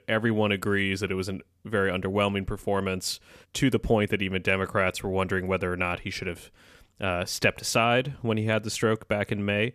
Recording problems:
none

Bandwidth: 14.5 kHz